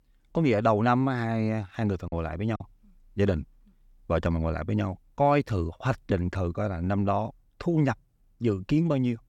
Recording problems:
choppy; very; at 2 s; 6% of the speech affected

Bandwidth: 18 kHz